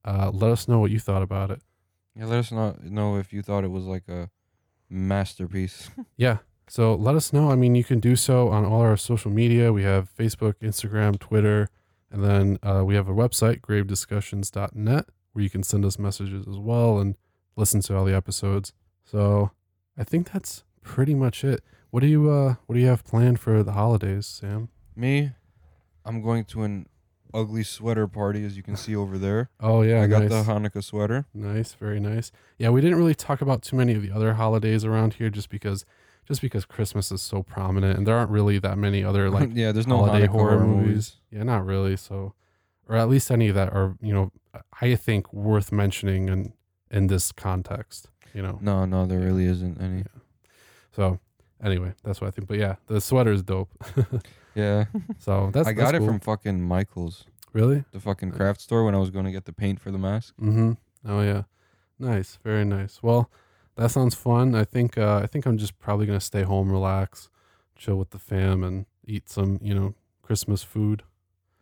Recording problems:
none

